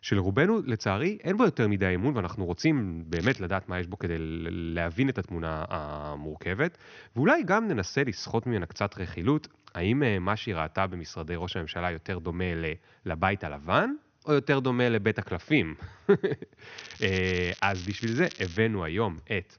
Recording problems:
high frequencies cut off; noticeable; nothing above 6.5 kHz
crackling; noticeable; at 3 s and from 17 to 19 s; 15 dB below the speech

